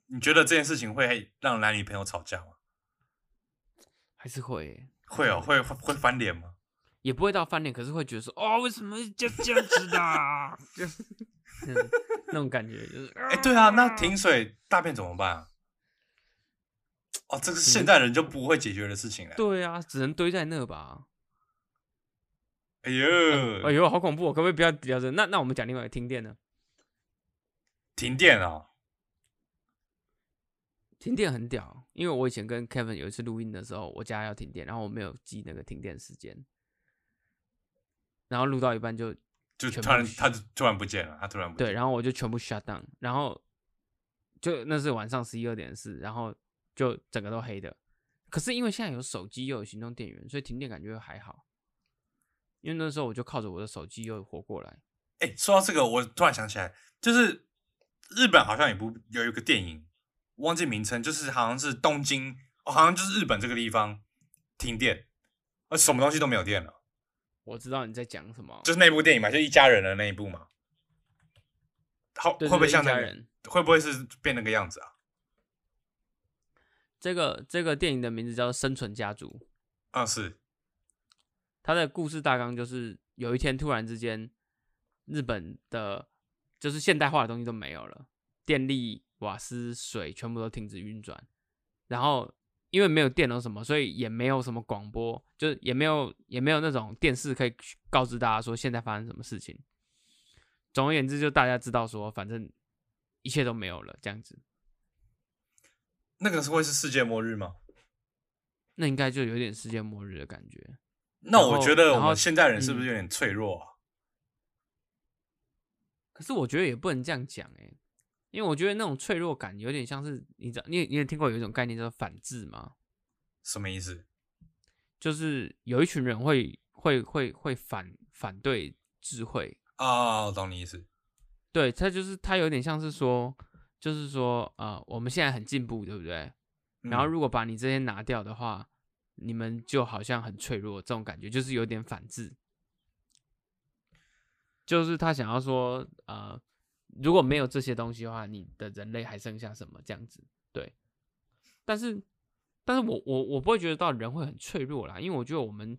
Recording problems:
none

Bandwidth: 15 kHz